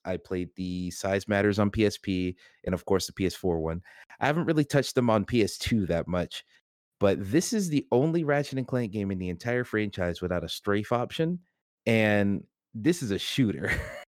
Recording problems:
none

